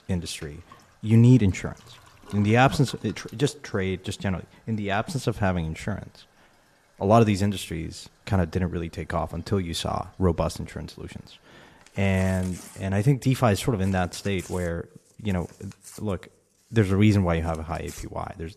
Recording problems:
household noises; faint; throughout; 20 dB below the speech

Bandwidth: 13.5 kHz